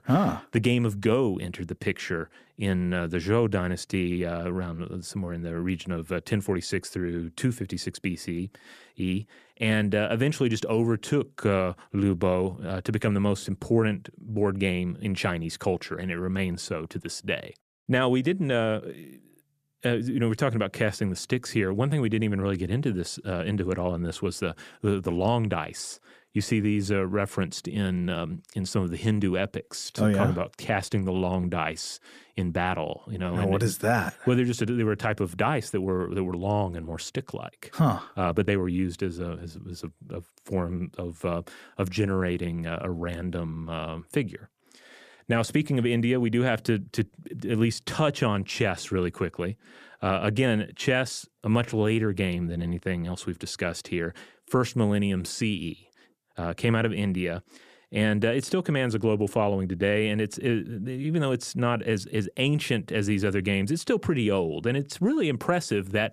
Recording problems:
none

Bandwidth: 14.5 kHz